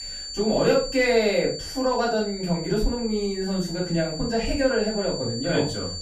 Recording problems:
off-mic speech; far
room echo; slight; dies away in 0.3 s
high-pitched whine; loud; throughout; 4.5 kHz, 9 dB below the speech

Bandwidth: 15.5 kHz